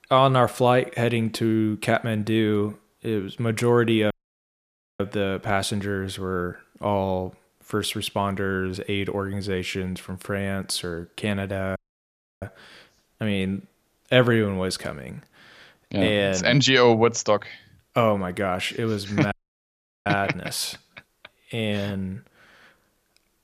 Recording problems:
audio cutting out; at 4 s for 1 s, at 12 s for 0.5 s and at 19 s for 0.5 s

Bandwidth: 14.5 kHz